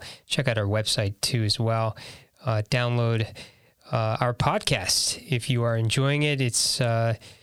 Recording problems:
squashed, flat; somewhat

